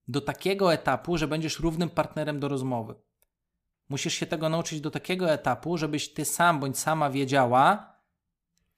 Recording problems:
none

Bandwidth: 15 kHz